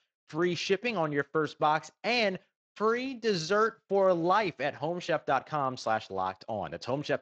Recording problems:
garbled, watery; slightly

